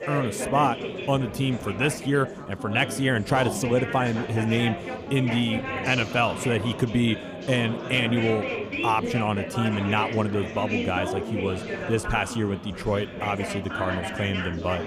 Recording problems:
chatter from many people; loud; throughout; 6 dB below the speech

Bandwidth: 15 kHz